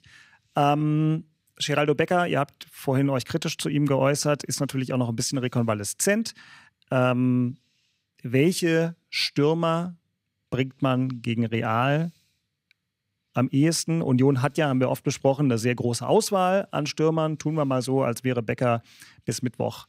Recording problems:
none

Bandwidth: 15.5 kHz